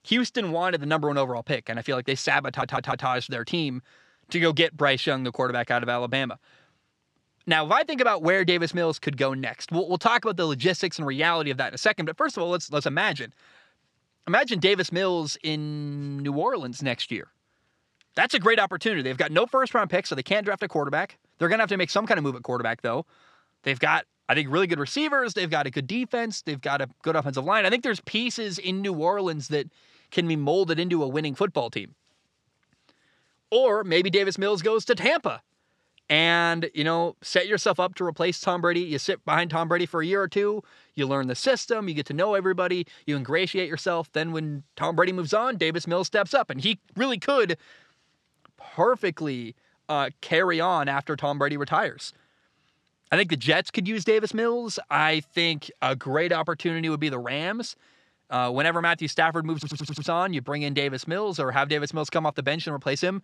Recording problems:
audio stuttering; at 2.5 s and at 1:00

